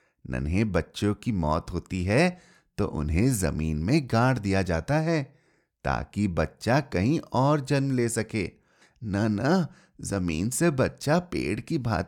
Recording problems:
none

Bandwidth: 18.5 kHz